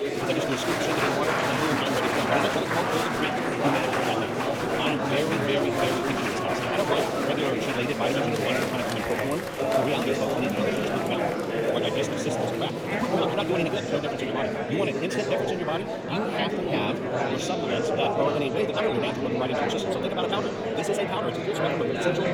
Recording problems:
wrong speed, natural pitch; too fast; 1.7 times normal speed
murmuring crowd; very loud; throughout; 4 dB above the speech

